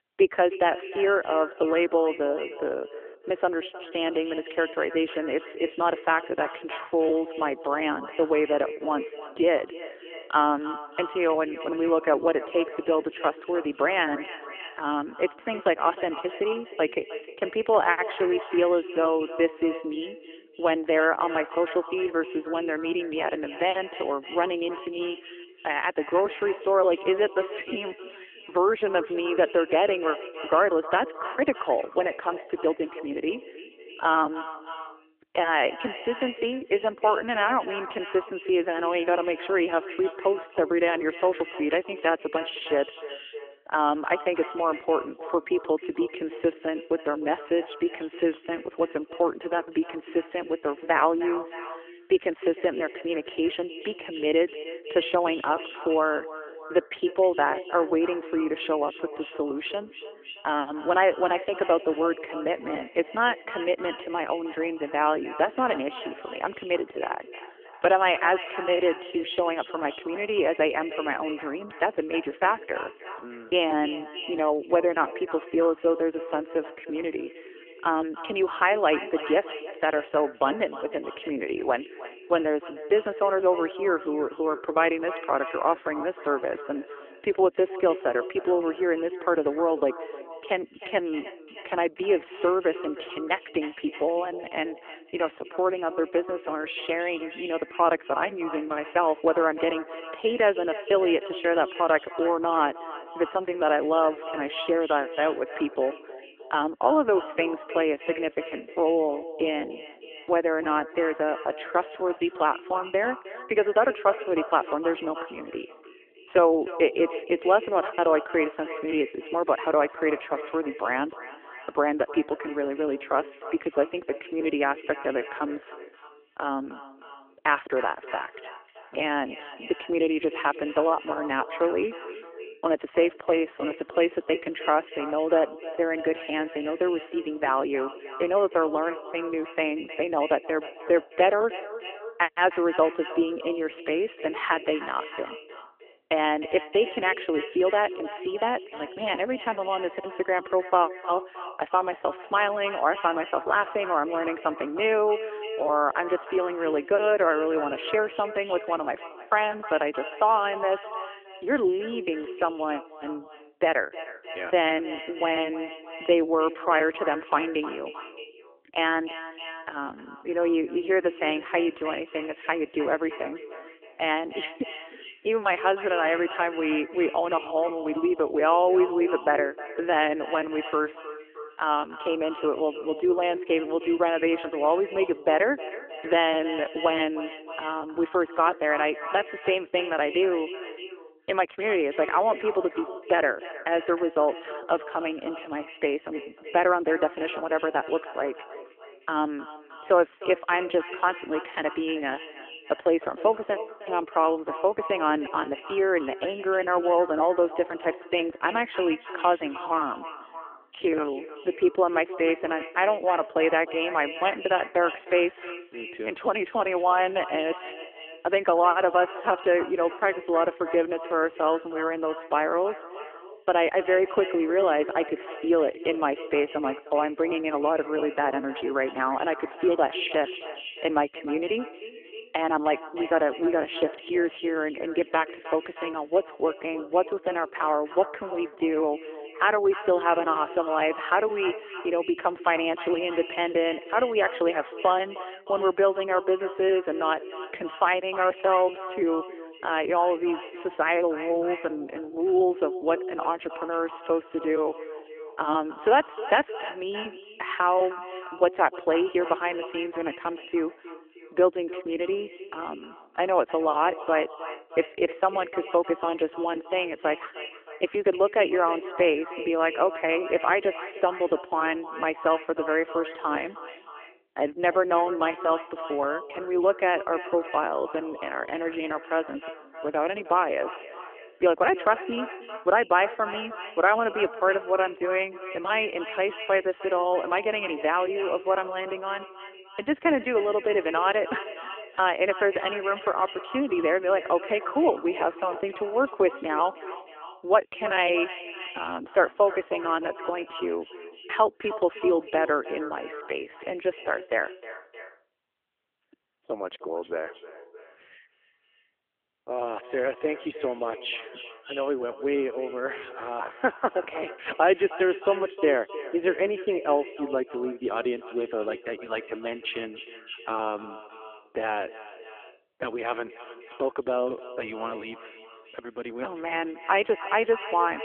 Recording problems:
echo of what is said; noticeable; throughout; 310 ms later, 15 dB below the speech
phone-call audio; nothing above 3 kHz

